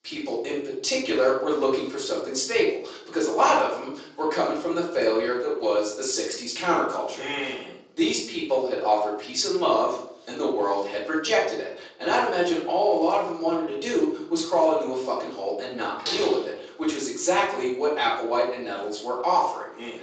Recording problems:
off-mic speech; far
thin; very; fading below 350 Hz
room echo; noticeable; dies away in 0.5 s
garbled, watery; slightly; nothing above 7.5 kHz
door banging; noticeable; at 16 s; peak 3 dB below the speech

